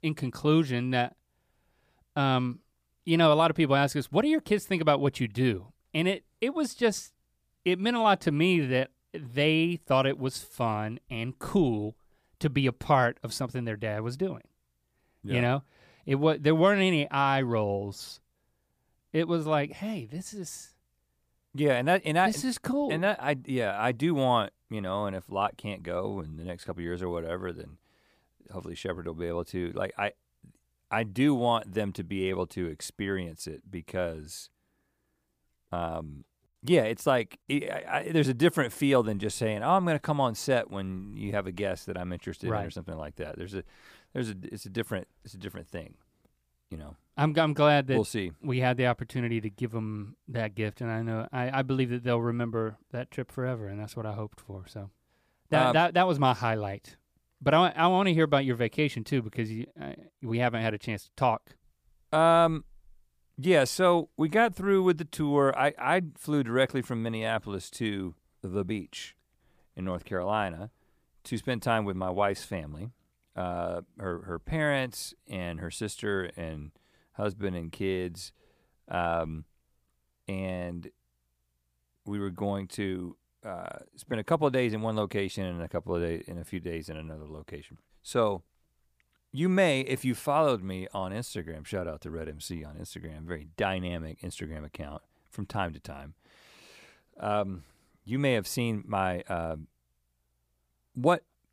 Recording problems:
none

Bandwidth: 15 kHz